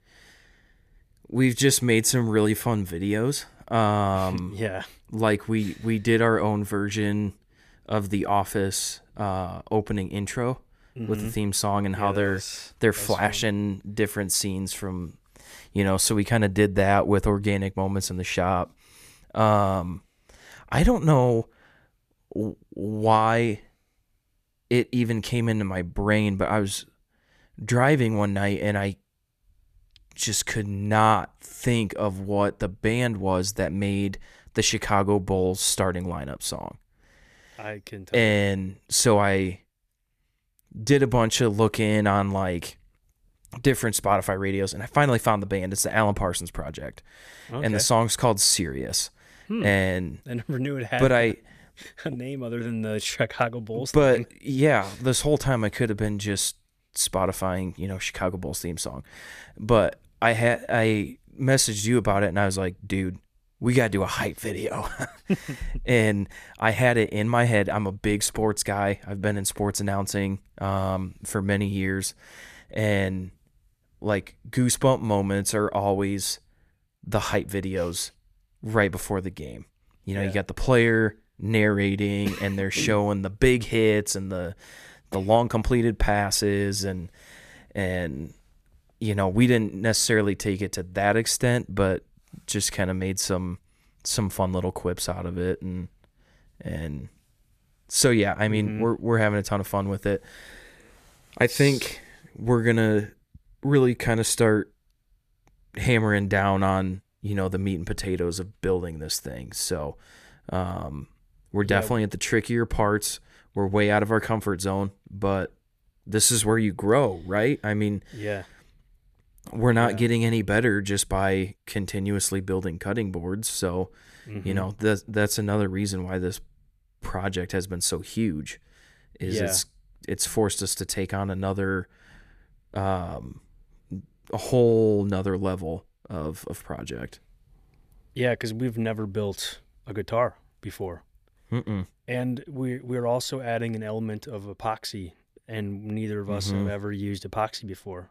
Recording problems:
none

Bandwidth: 14.5 kHz